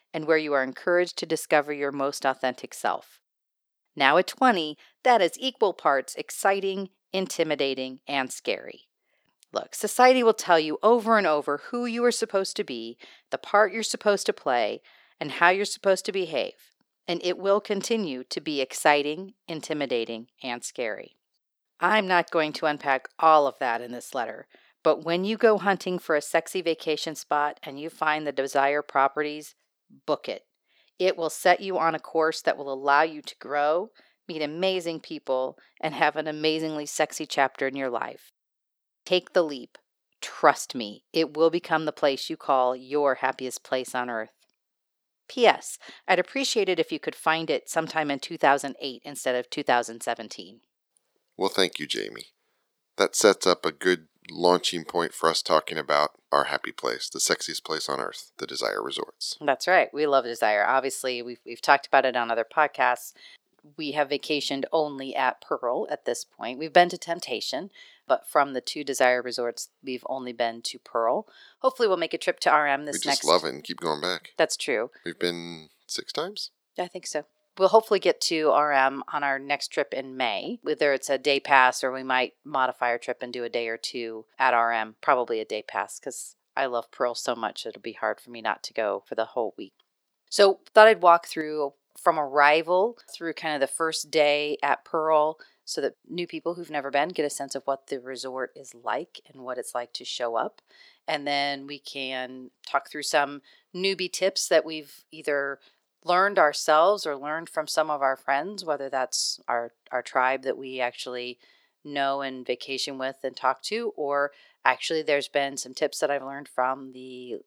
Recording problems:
thin; somewhat; fading below 450 Hz

